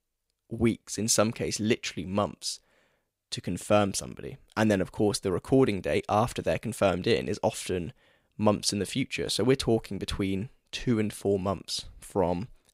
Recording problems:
none

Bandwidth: 15.5 kHz